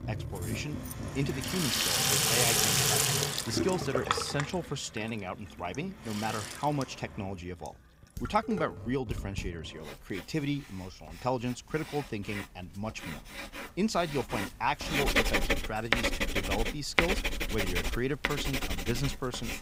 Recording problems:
household noises; very loud; throughout; 5 dB above the speech
jangling keys; noticeable; from 1 to 3 s; peak 6 dB below the speech
clattering dishes; noticeable; from 8 to 9.5 s; peak 5 dB below the speech

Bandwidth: 15.5 kHz